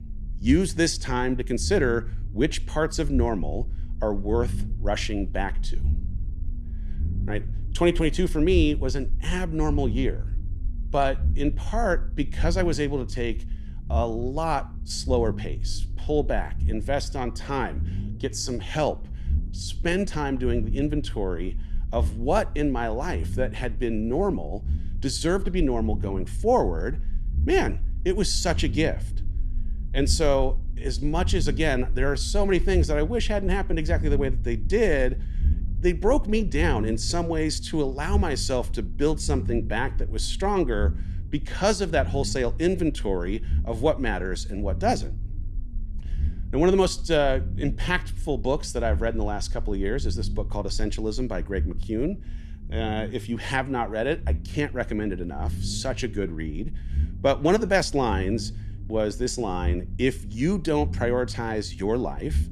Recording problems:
low rumble; faint; throughout; 20 dB below the speech

